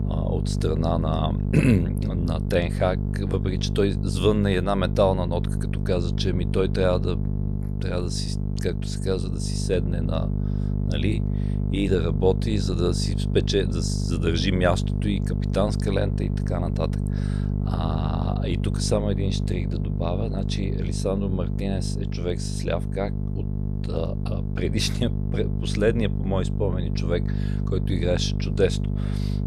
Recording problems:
electrical hum; loud; throughout; 50 Hz, 9 dB below the speech

